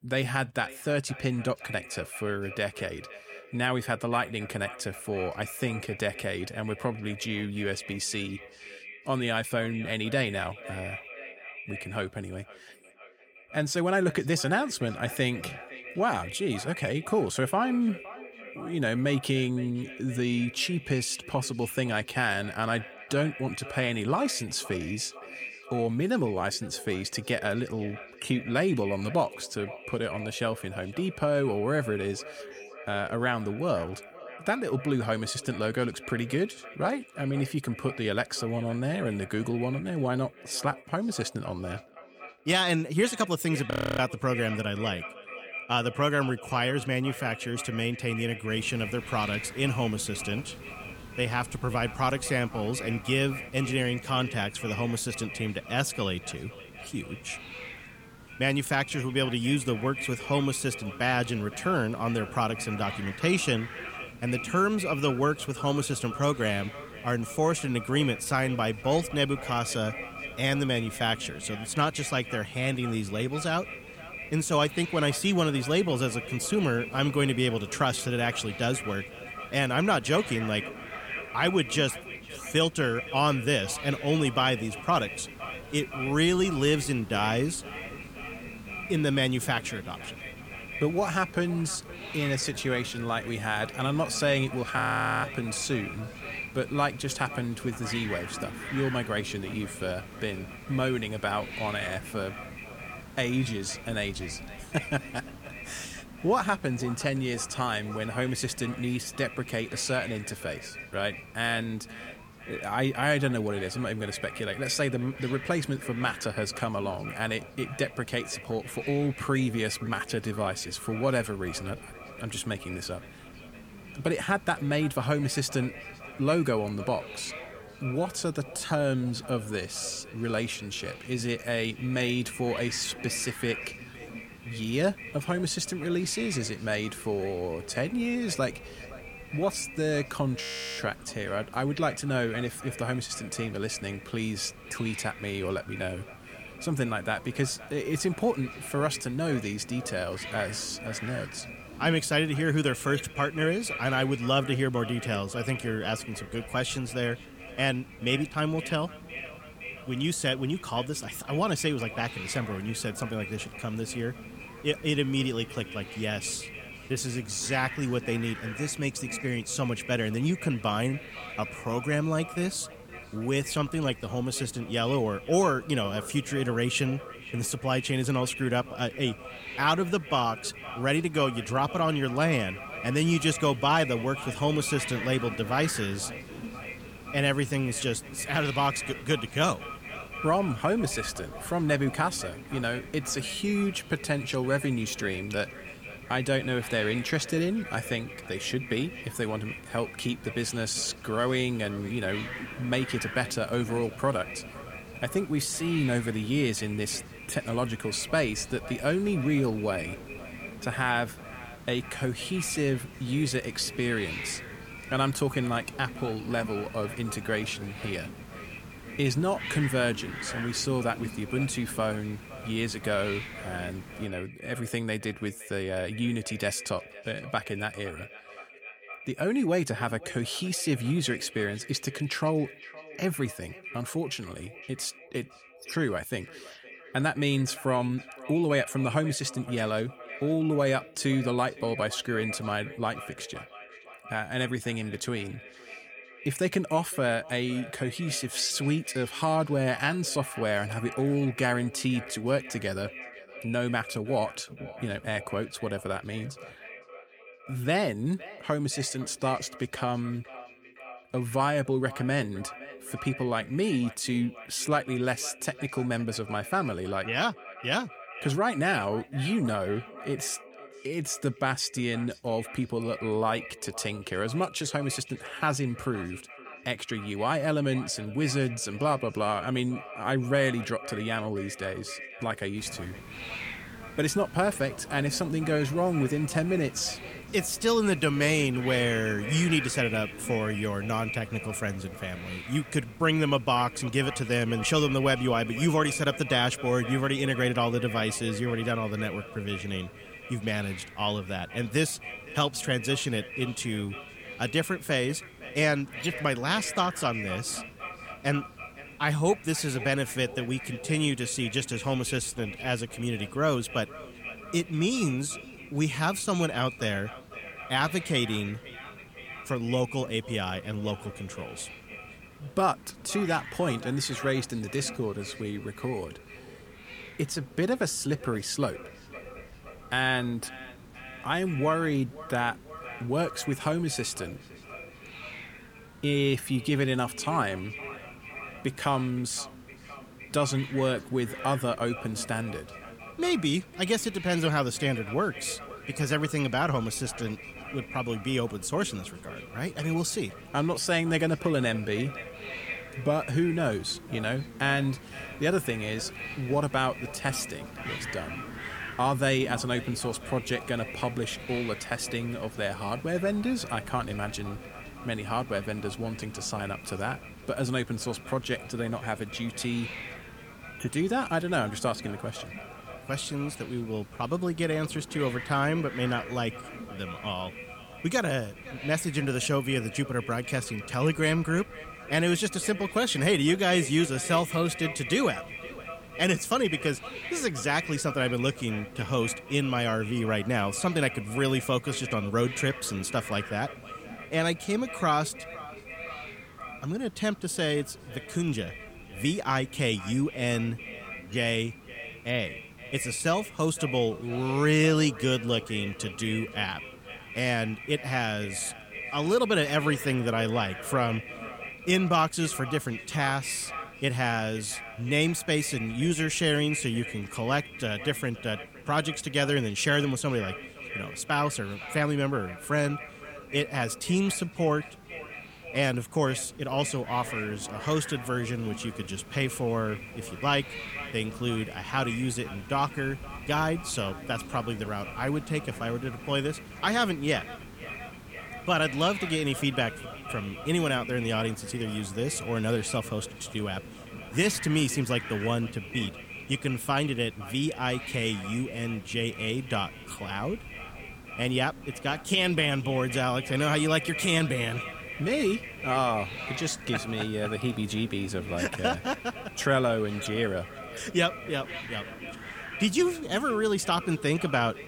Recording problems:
echo of what is said; noticeable; throughout; 510 ms later, 15 dB below the speech
hiss; noticeable; from 49 s to 3:44 and from 4:43 on; 15 dB below the speech
audio freezing; at 44 s, at 1:35 and at 2:20

